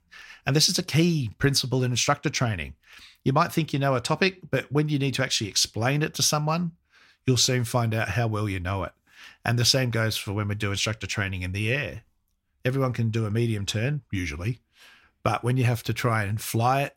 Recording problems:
none

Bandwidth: 16.5 kHz